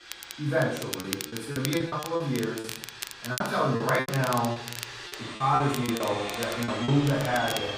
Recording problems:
off-mic speech; far
room echo; noticeable; dies away in 0.6 s
household noises; noticeable; throughout; 10 dB below the speech
crackle, like an old record; noticeable; 10 dB below the speech
choppy; very; 13% of the speech affected

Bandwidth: 15 kHz